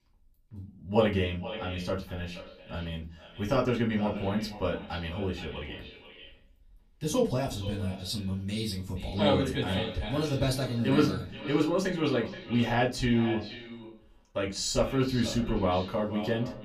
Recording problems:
off-mic speech; far
echo of what is said; noticeable; throughout; 470 ms later, 15 dB below the speech
room echo; very slight; dies away in 0.2 s

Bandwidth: 15 kHz